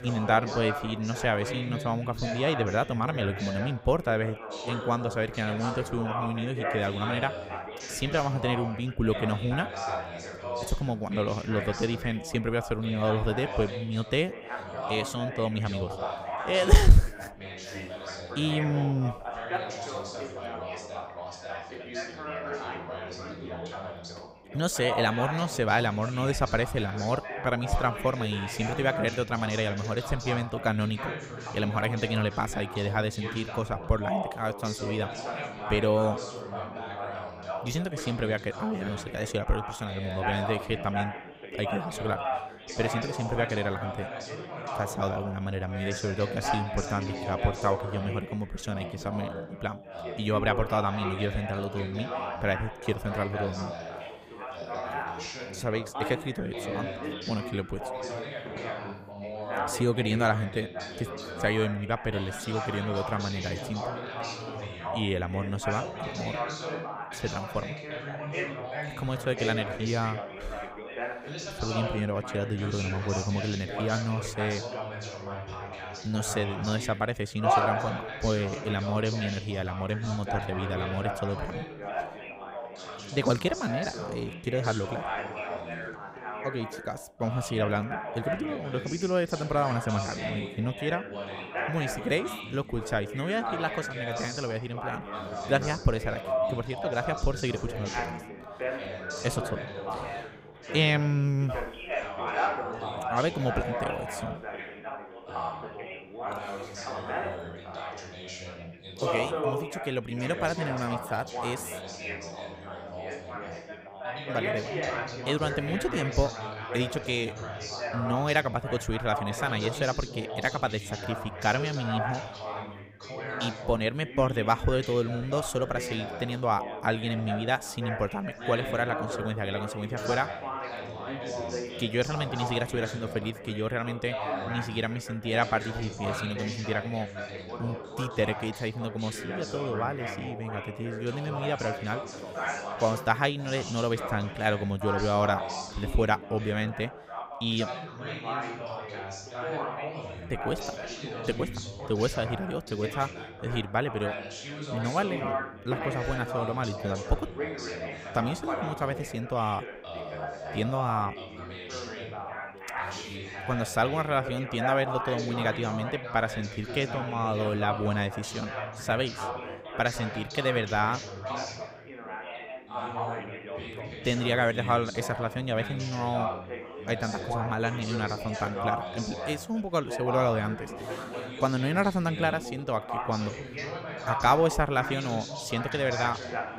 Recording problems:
background chatter; loud; throughout; 4 voices, 6 dB below the speech

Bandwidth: 15.5 kHz